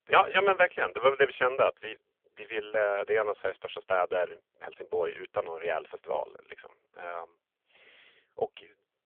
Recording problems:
phone-call audio; poor line; nothing above 3 kHz

